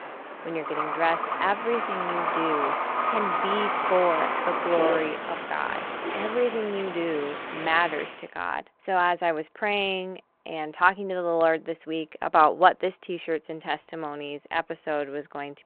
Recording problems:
phone-call audio
traffic noise; loud; until 8 s; 1 dB below the speech

